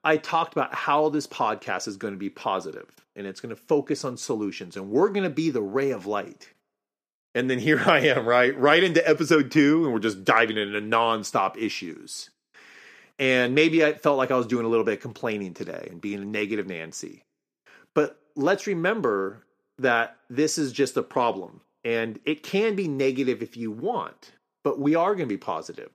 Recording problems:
none

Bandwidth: 14.5 kHz